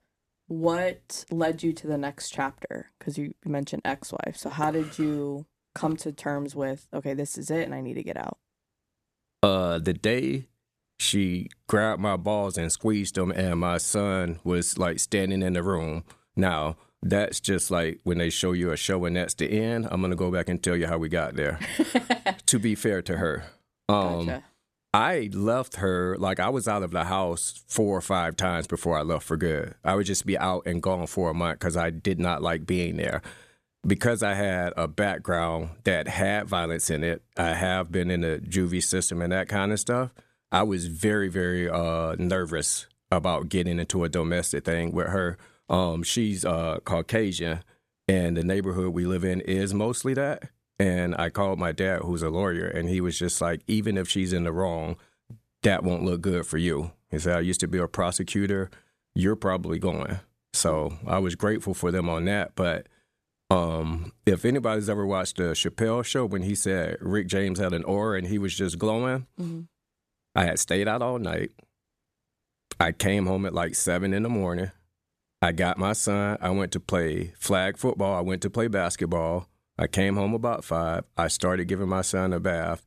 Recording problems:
none

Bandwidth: 14.5 kHz